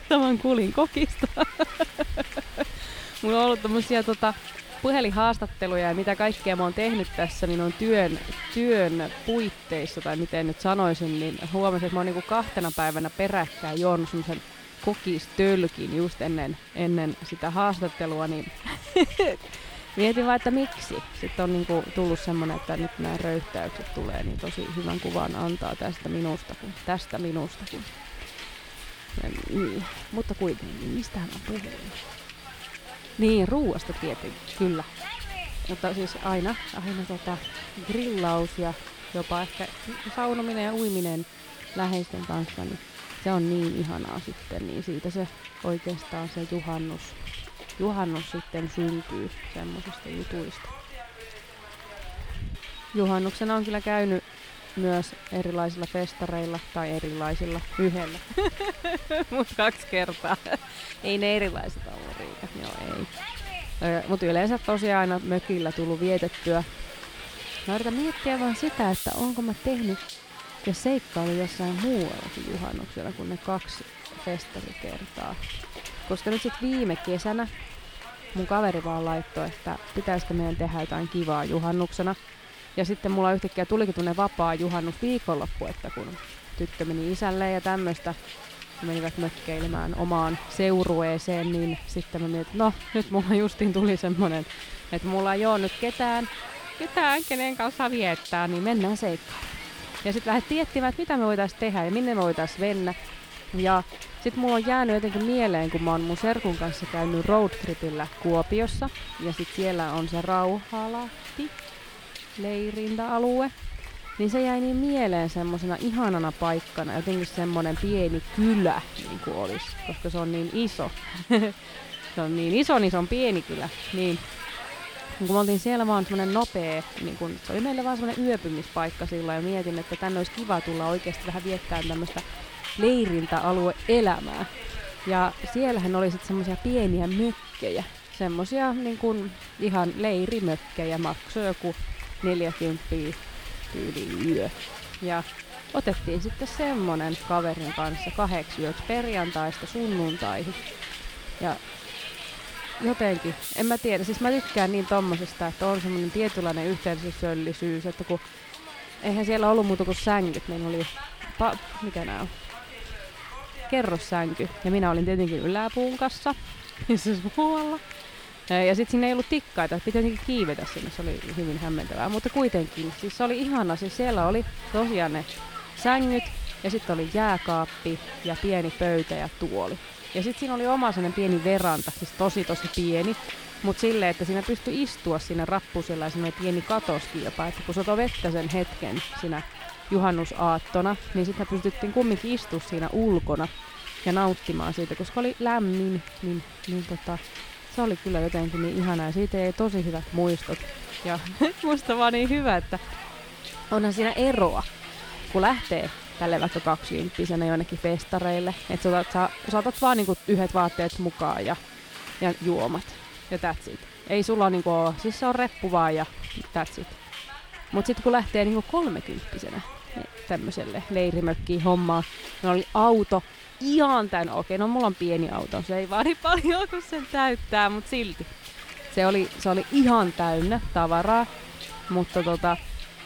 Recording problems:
hiss; noticeable; throughout; 10 dB below the speech

